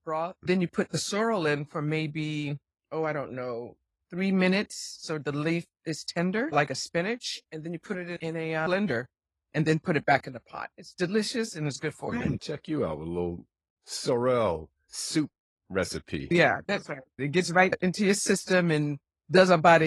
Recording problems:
garbled, watery; slightly; nothing above 11.5 kHz
abrupt cut into speech; at the end

